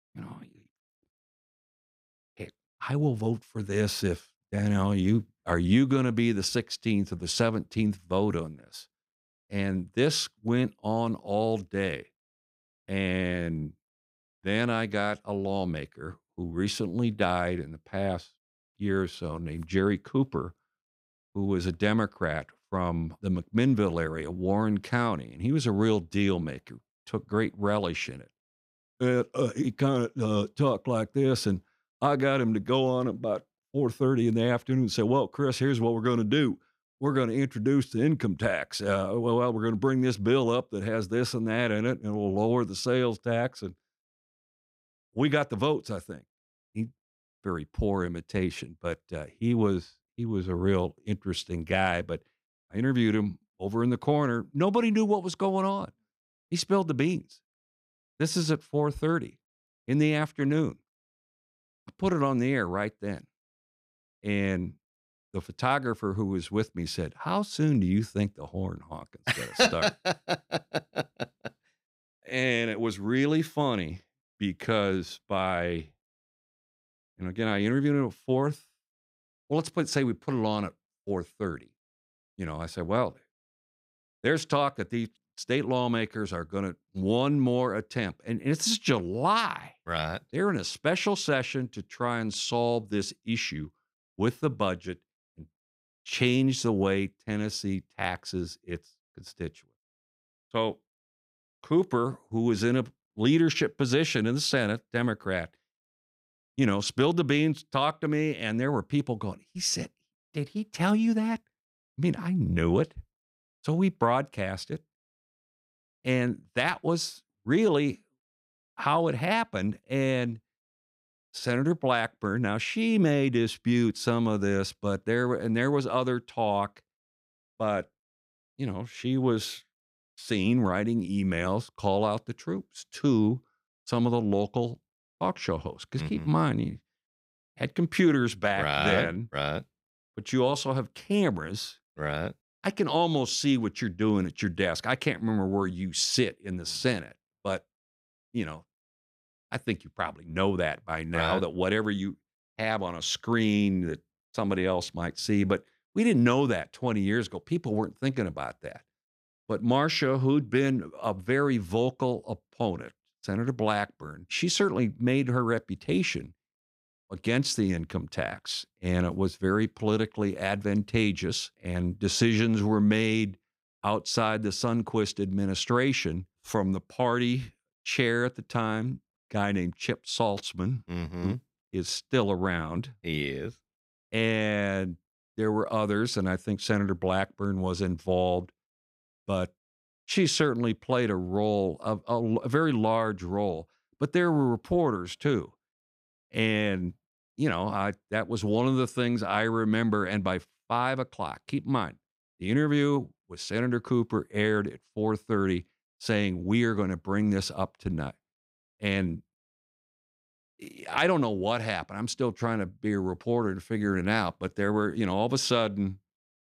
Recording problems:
none

